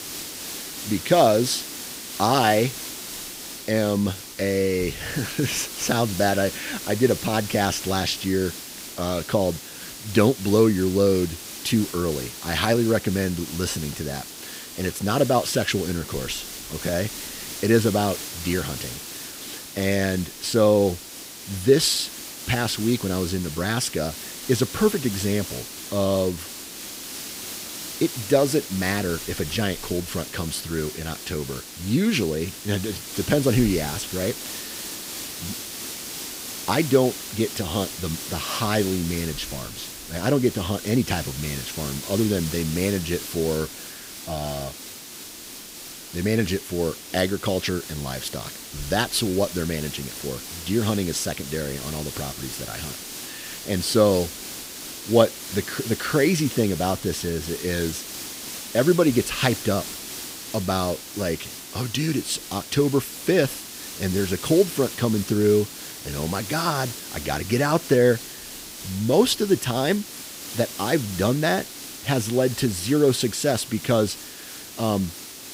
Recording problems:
hiss; loud; throughout; 10 dB below the speech

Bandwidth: 15.5 kHz